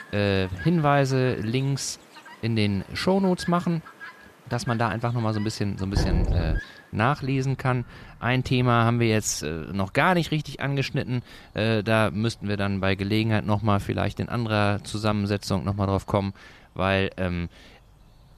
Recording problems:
animal sounds; faint; throughout; 20 dB below the speech
door banging; loud; at 6 s; peak level with the speech

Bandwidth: 14.5 kHz